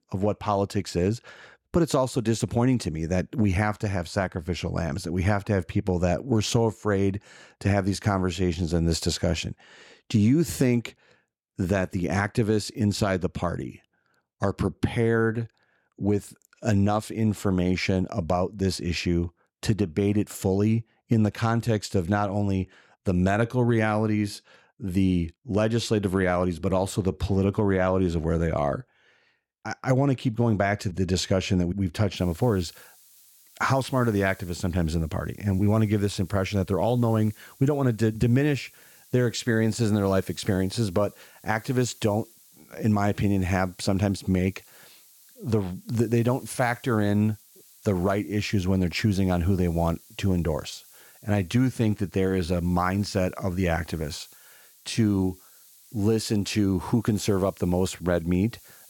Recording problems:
hiss; faint; from 32 s on; 25 dB below the speech

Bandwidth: 17 kHz